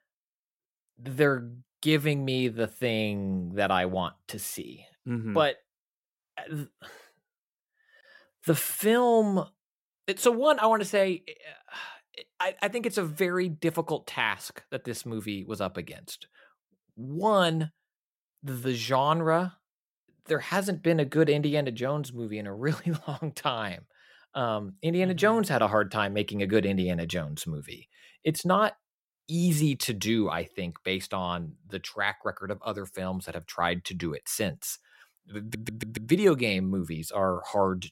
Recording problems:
audio stuttering; at 35 s

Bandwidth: 16.5 kHz